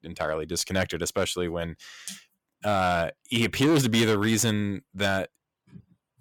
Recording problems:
distortion; slight; 5% of the sound clipped

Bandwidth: 17.5 kHz